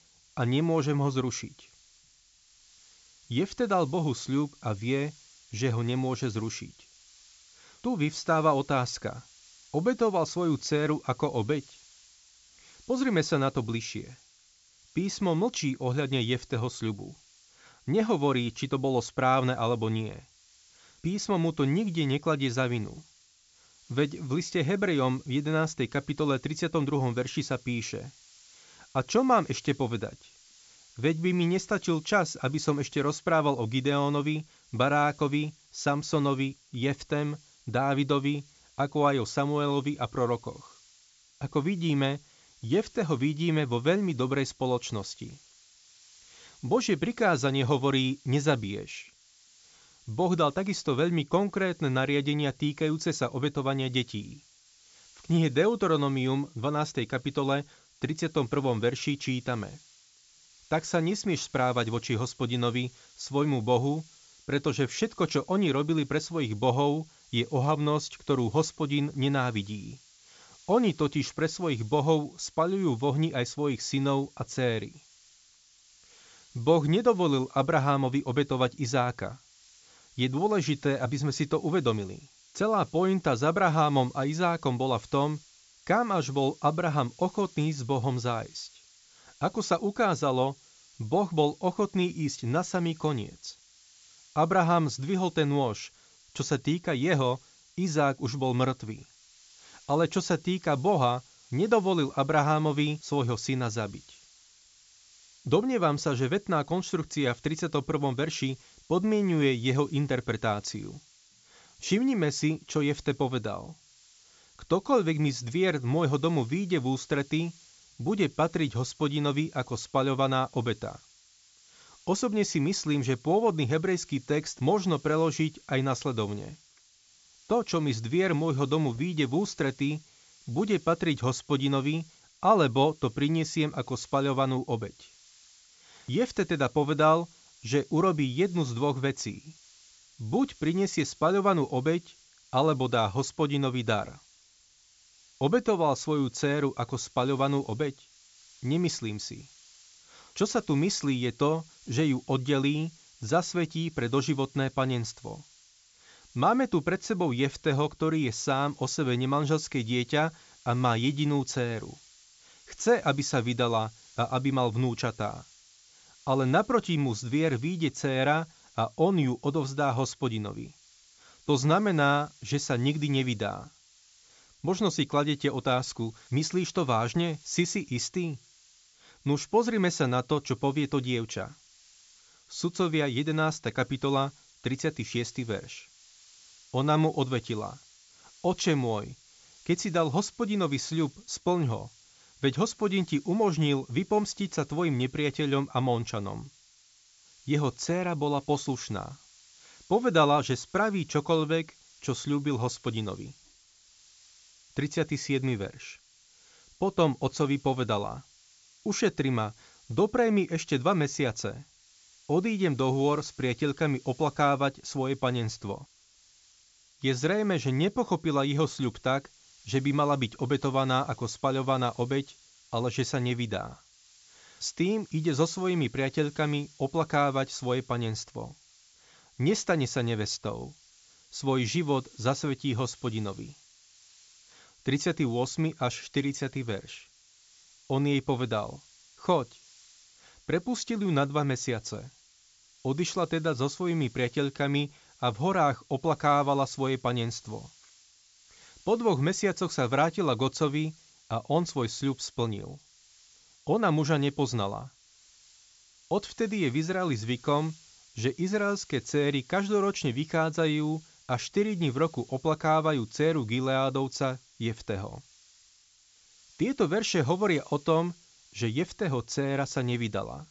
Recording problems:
high frequencies cut off; noticeable; nothing above 8 kHz
hiss; faint; throughout; 25 dB below the speech

